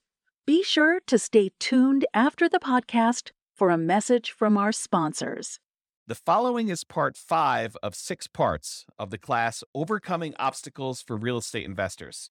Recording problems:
none

